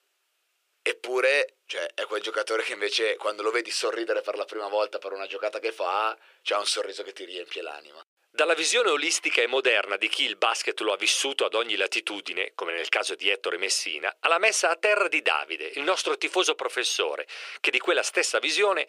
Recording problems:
thin; very; fading below 350 Hz

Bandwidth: 15 kHz